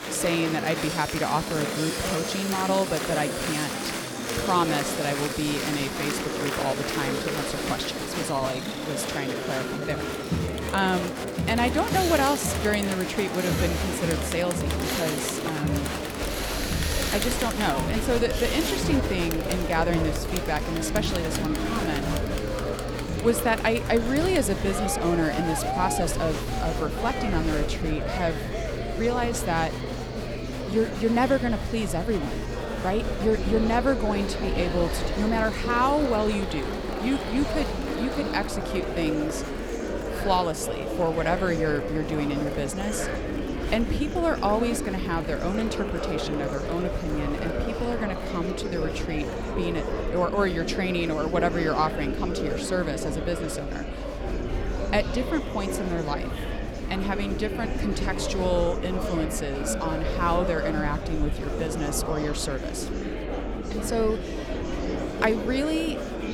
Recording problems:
machinery noise; loud; until 39 s; 9 dB below the speech
murmuring crowd; loud; throughout; 3 dB below the speech
low rumble; faint; from 16 s on; 25 dB below the speech

